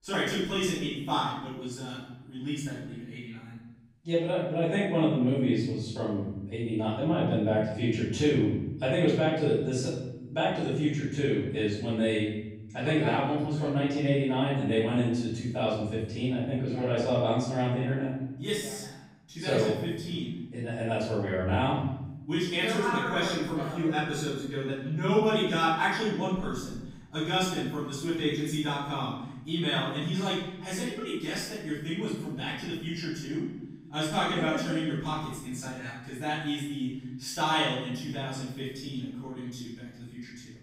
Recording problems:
room echo; strong; dies away in 1.1 s
off-mic speech; far

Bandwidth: 15.5 kHz